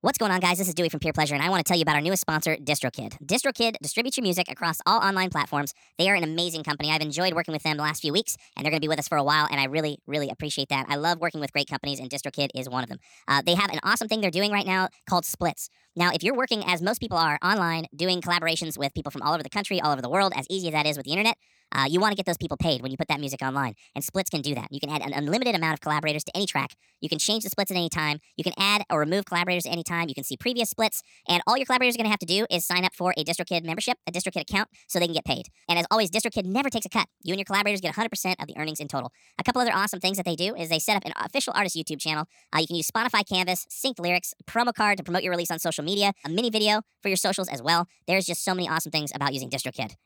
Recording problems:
wrong speed and pitch; too fast and too high; 1.5 times normal speed

